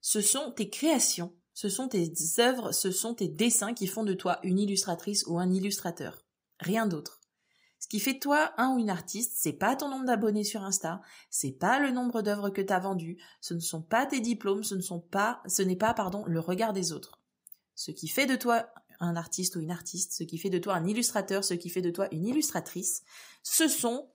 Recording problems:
none

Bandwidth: 15.5 kHz